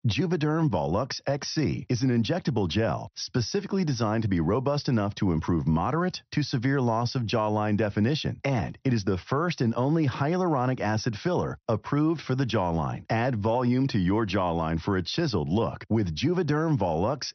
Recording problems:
high frequencies cut off; noticeable; nothing above 6 kHz

